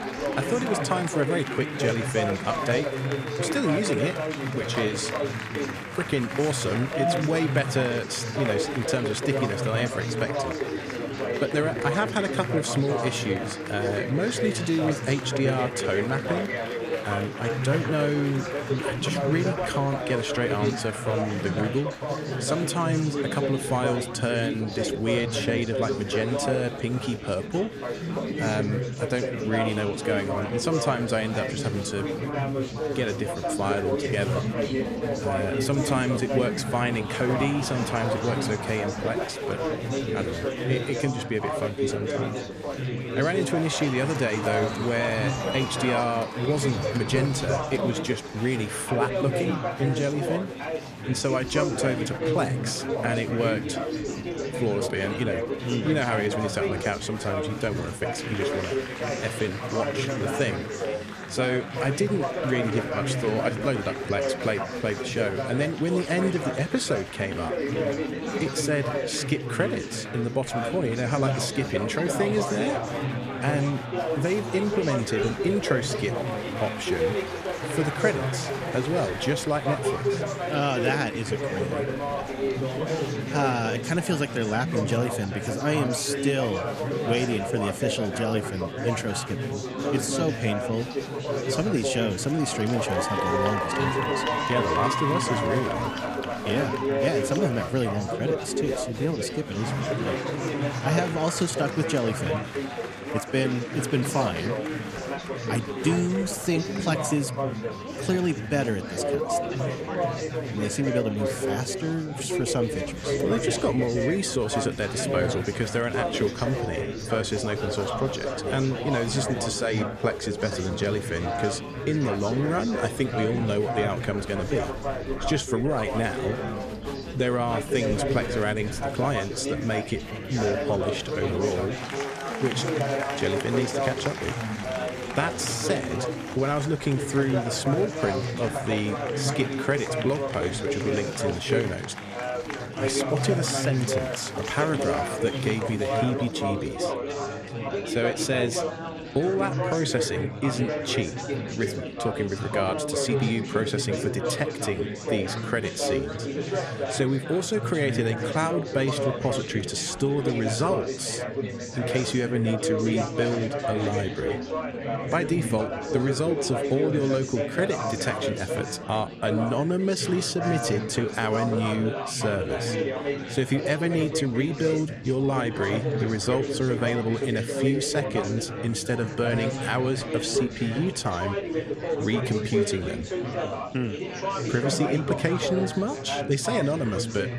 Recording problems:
chatter from many people; loud; throughout; 2 dB below the speech

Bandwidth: 14.5 kHz